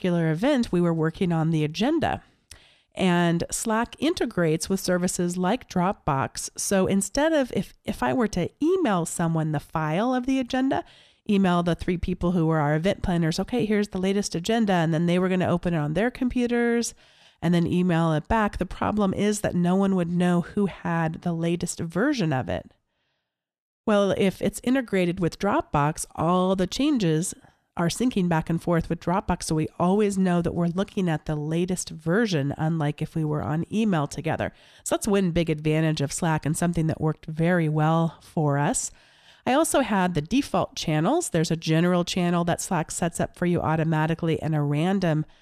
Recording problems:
none

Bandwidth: 14 kHz